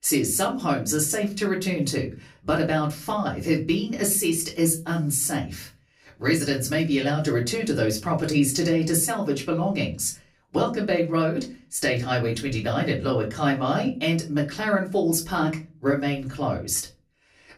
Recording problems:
off-mic speech; far
room echo; very slight; dies away in 0.3 s

